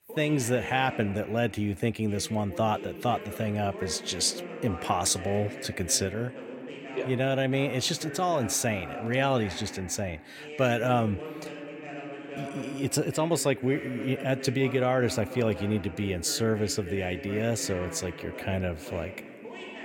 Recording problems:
voice in the background; noticeable; throughout; 10 dB below the speech

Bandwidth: 16.5 kHz